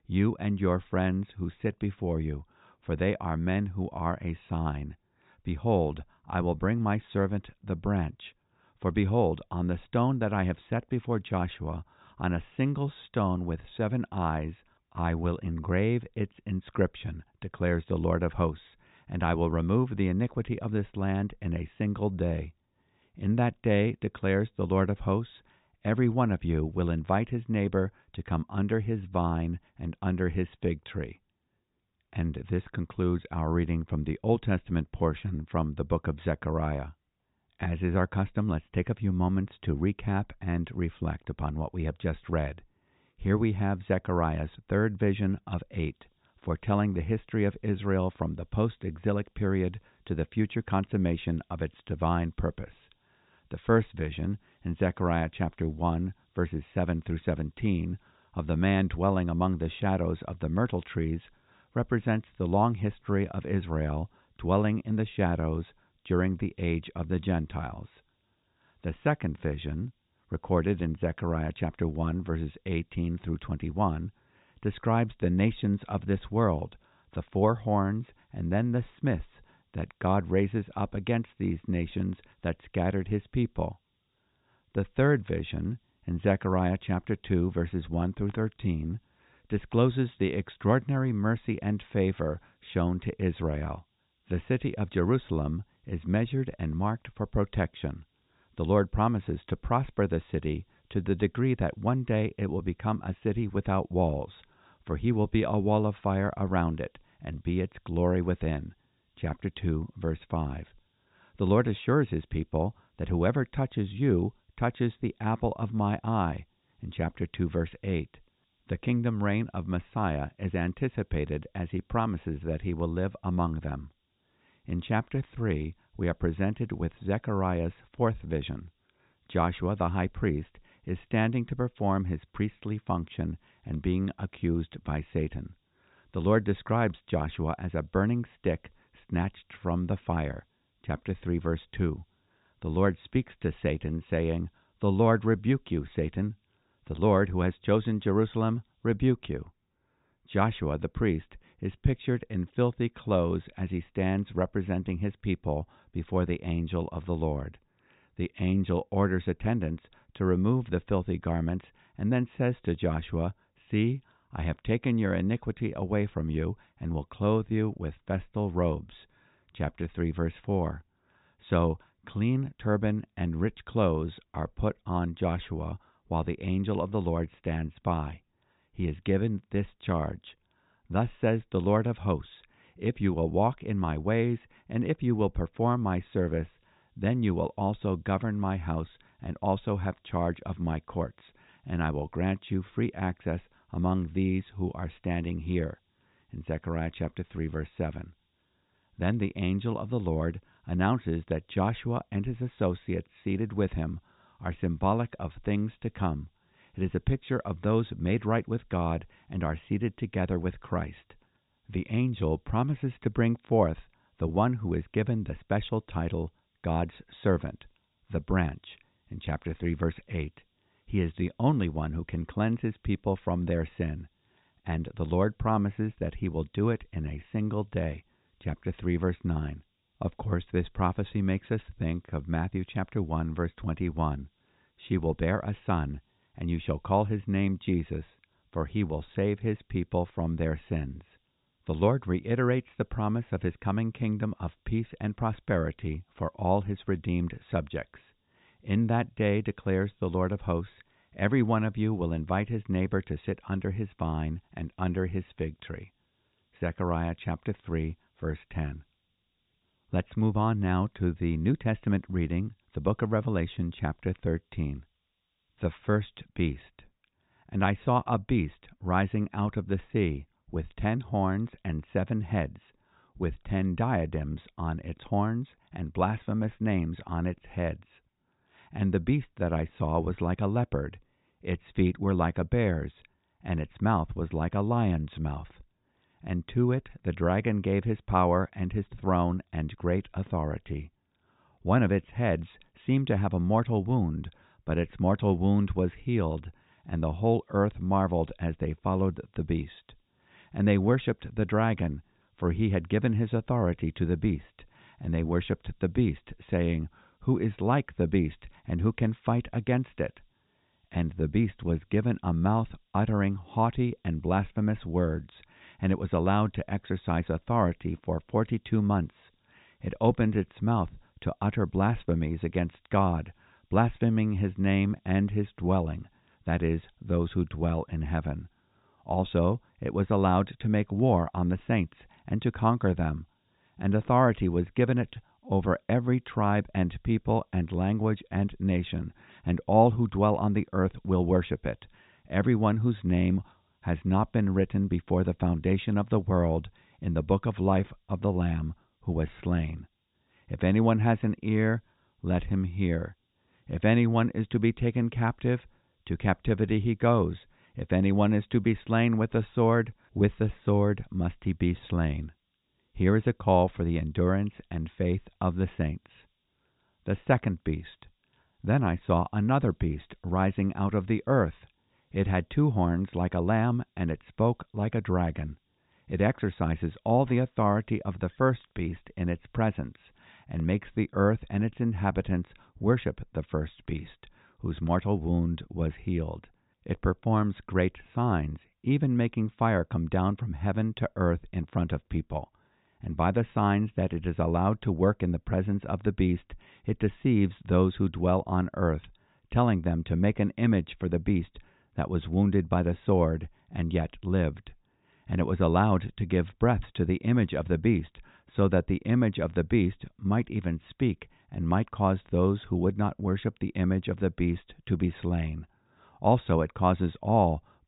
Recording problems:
high frequencies cut off; severe; nothing above 4 kHz
hiss; very faint; from 46 s to 2:29, from 3:06 to 4:26 and from 4:57 to 6:20; 50 dB below the speech

